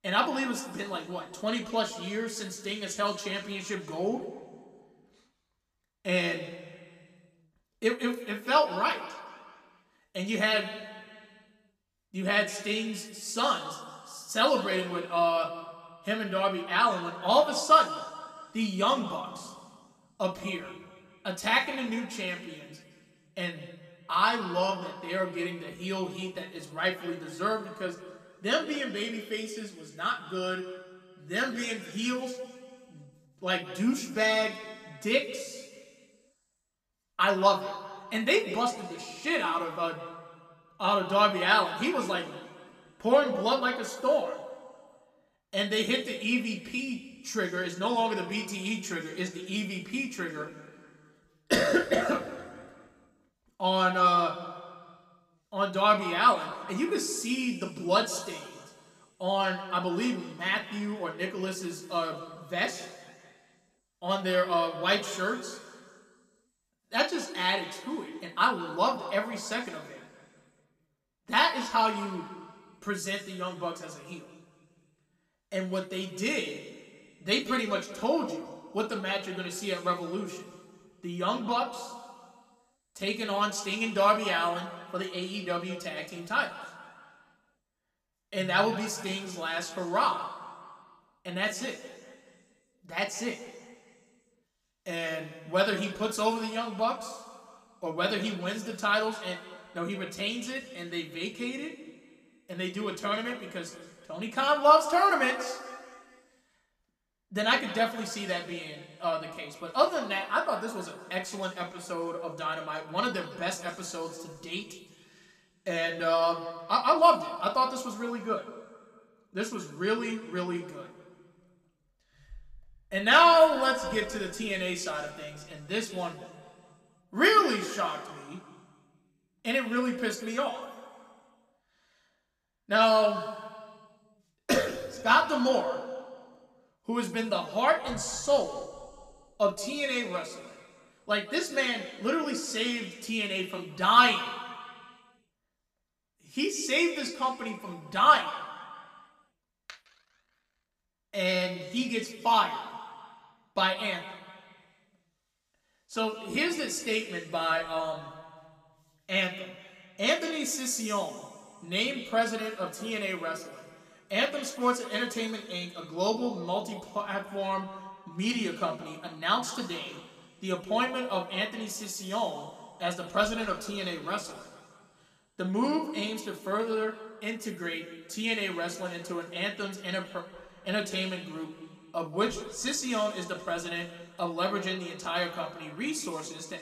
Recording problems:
room echo; slight; dies away in 1.6 s
off-mic speech; somewhat distant

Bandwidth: 14.5 kHz